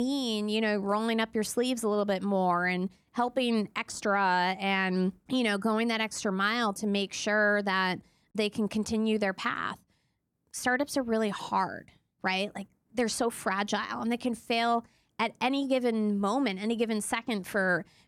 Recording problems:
abrupt cut into speech; at the start

